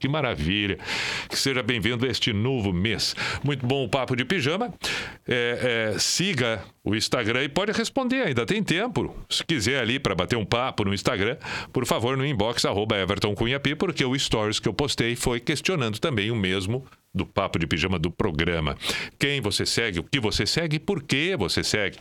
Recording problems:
squashed, flat; heavily

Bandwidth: 17.5 kHz